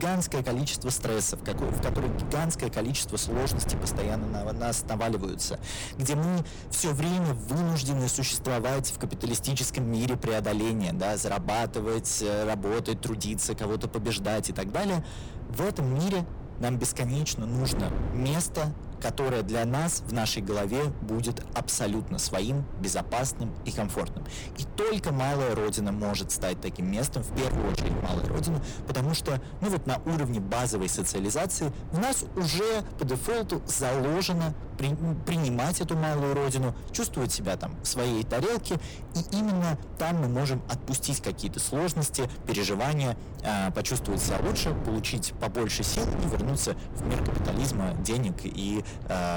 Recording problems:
distortion; heavy; 29% of the sound clipped
wind noise on the microphone; occasional gusts; 10 dB below the speech
abrupt cut into speech; at the start and the end

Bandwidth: 18 kHz